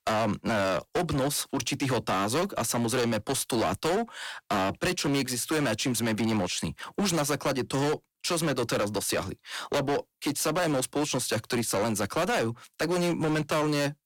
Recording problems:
distortion; heavy; 22% of the sound clipped

